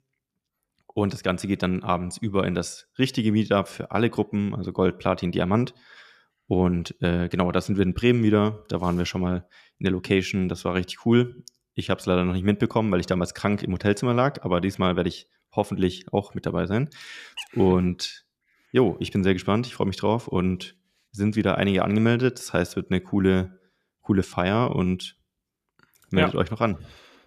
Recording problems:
none

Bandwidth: 14.5 kHz